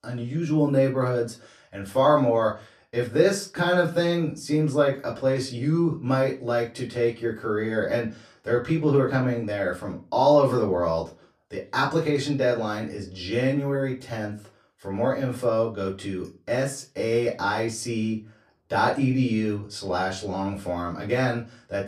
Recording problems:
off-mic speech; far
room echo; very slight; dies away in 0.3 s

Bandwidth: 14.5 kHz